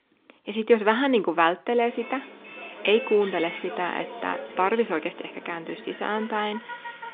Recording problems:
phone-call audio
traffic noise; noticeable; from 2 s on; 15 dB below the speech

